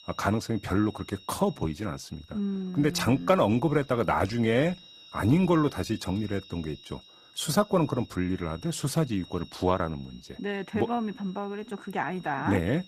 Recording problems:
garbled, watery; slightly; nothing above 14.5 kHz
high-pitched whine; faint; throughout; 4 kHz, 20 dB below the speech

